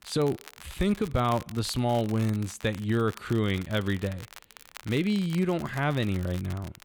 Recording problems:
crackle, like an old record; noticeable; 20 dB below the speech

